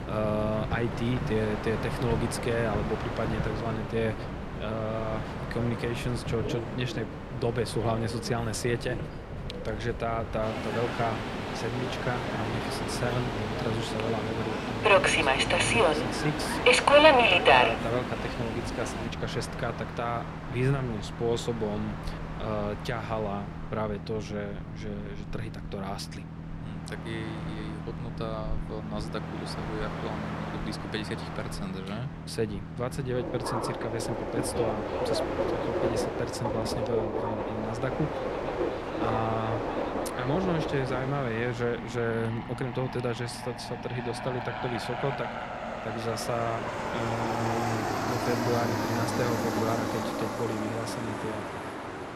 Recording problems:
train or aircraft noise; very loud; throughout; 3 dB above the speech

